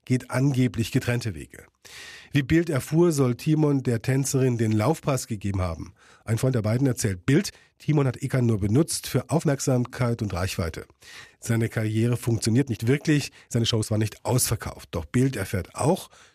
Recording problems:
uneven, jittery; strongly; from 3 to 16 s

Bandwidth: 14.5 kHz